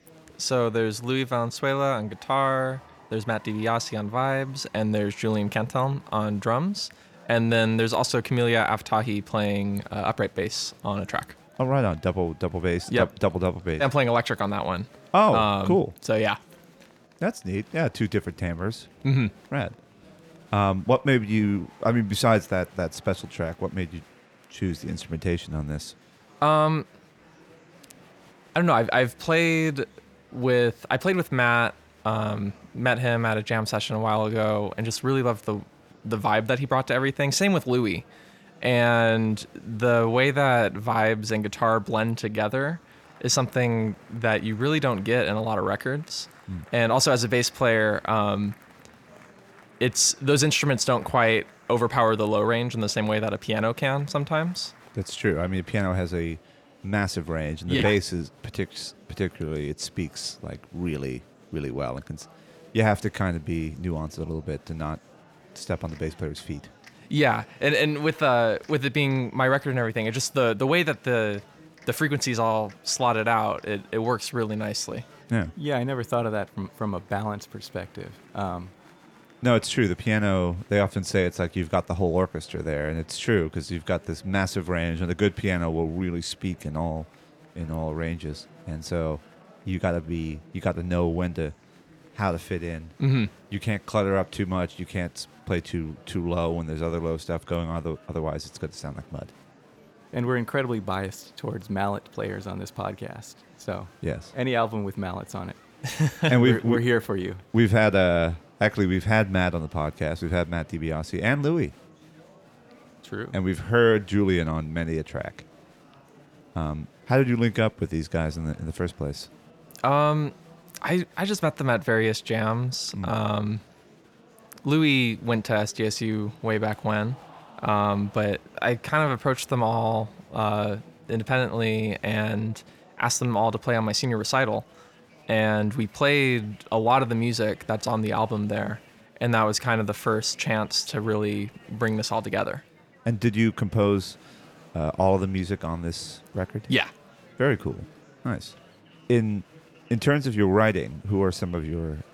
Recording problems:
murmuring crowd; faint; throughout; 25 dB below the speech

